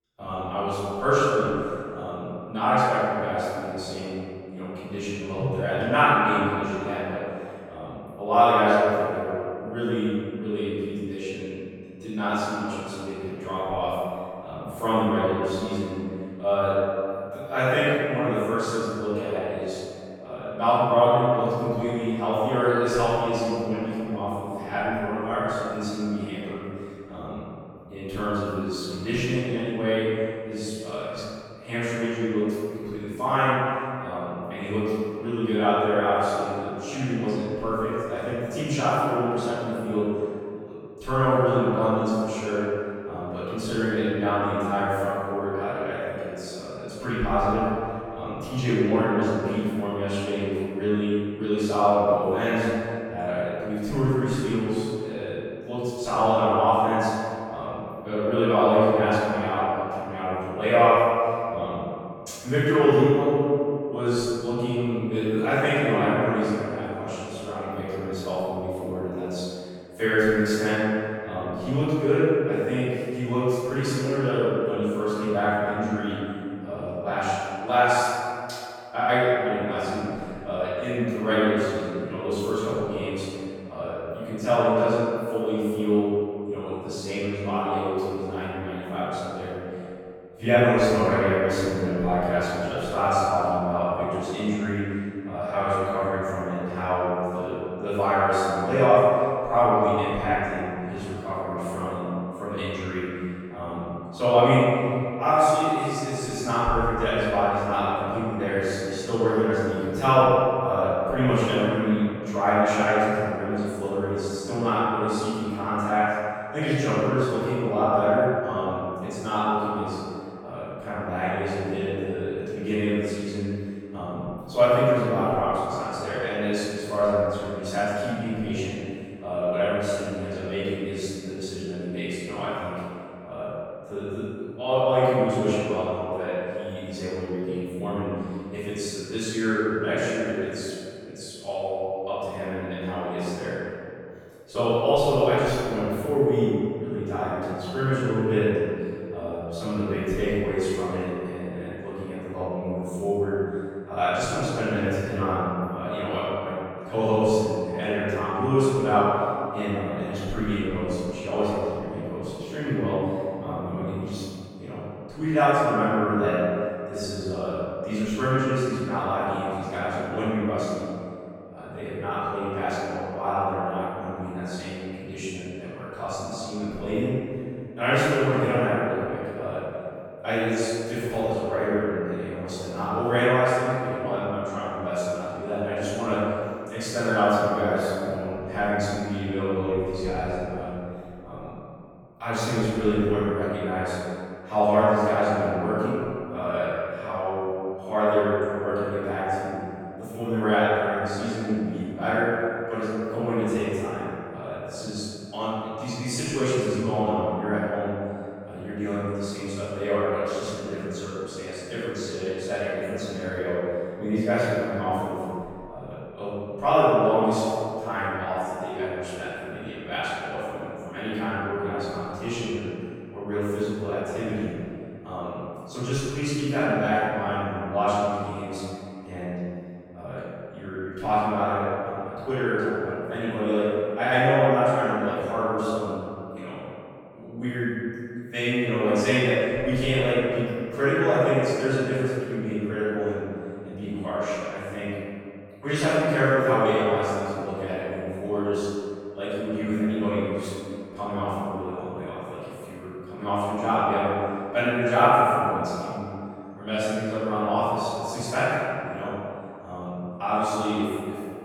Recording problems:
room echo; strong; dies away in 2.3 s
off-mic speech; far

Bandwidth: 17 kHz